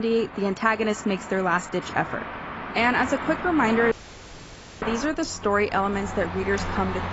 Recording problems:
high frequencies cut off; noticeable; nothing above 7.5 kHz
garbled, watery; slightly
traffic noise; loud; throughout; 10 dB below the speech
abrupt cut into speech; at the start
audio cutting out; at 4 s for 1 s

